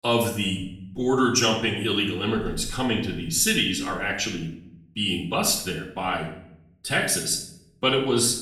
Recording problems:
off-mic speech; far
room echo; noticeable; dies away in 0.6 s

